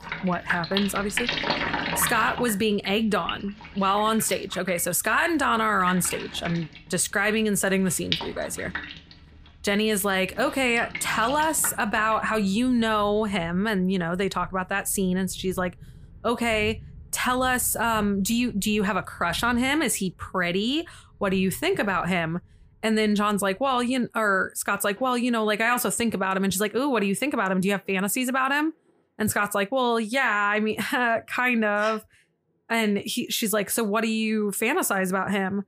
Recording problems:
rain or running water; loud; throughout; 10 dB below the speech

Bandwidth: 15 kHz